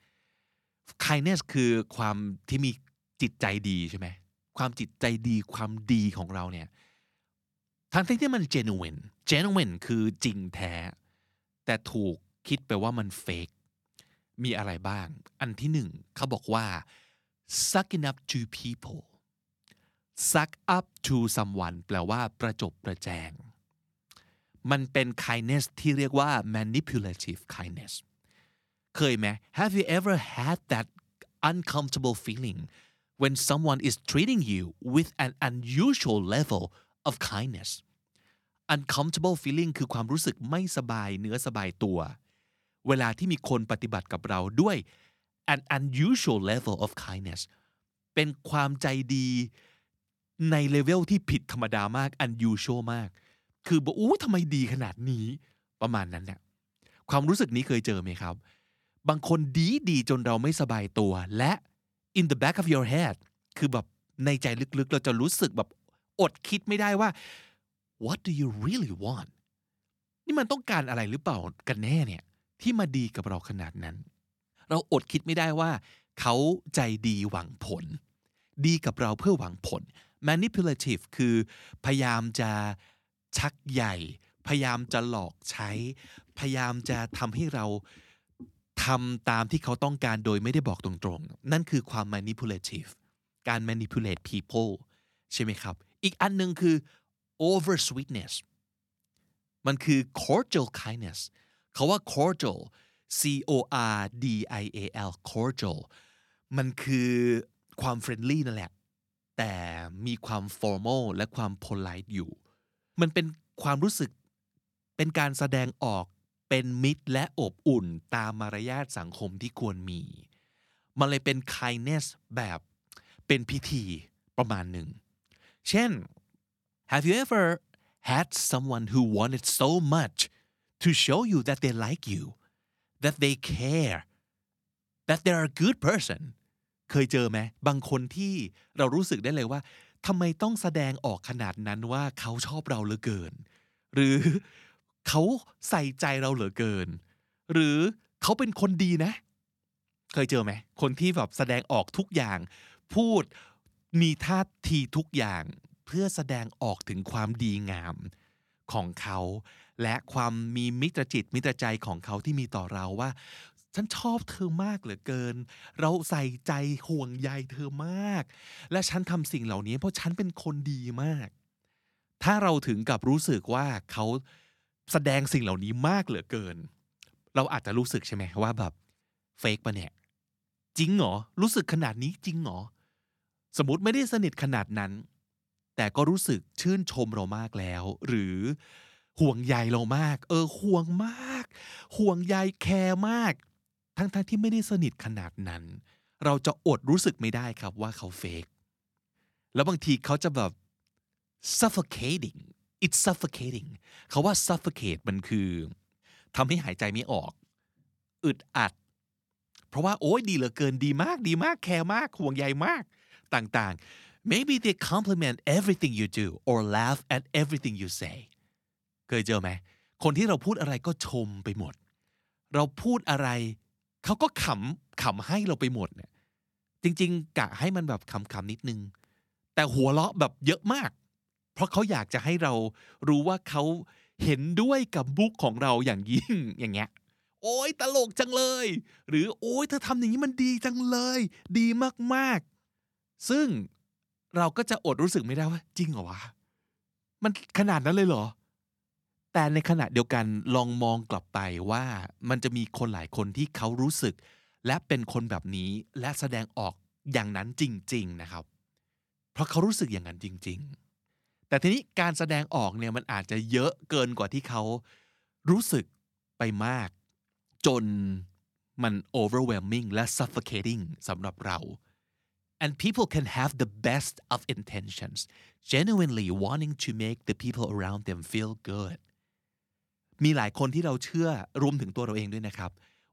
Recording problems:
none

